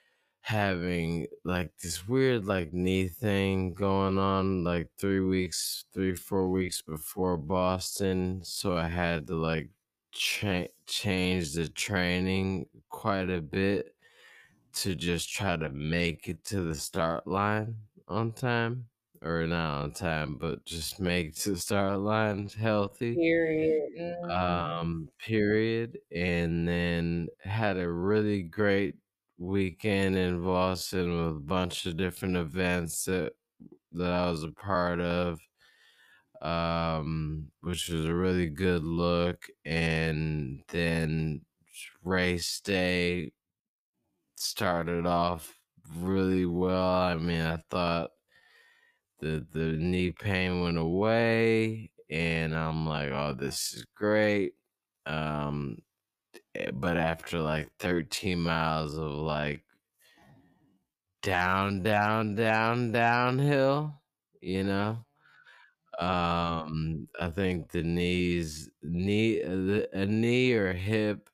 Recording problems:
wrong speed, natural pitch; too slow; 0.5 times normal speed

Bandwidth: 15 kHz